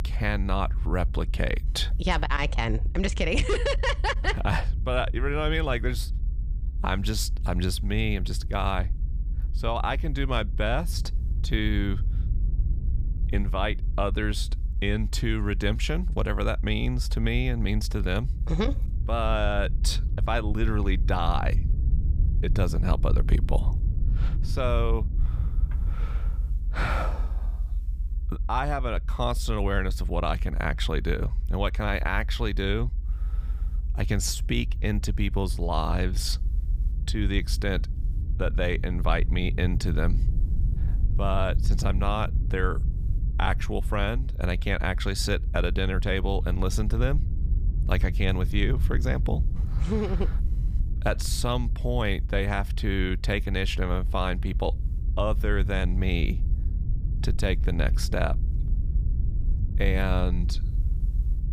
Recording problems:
low rumble; noticeable; throughout; 20 dB below the speech

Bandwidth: 15 kHz